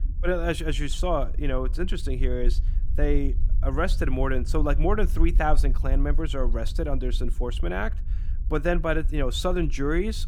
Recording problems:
low rumble; faint; throughout; 20 dB below the speech

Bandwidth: 18.5 kHz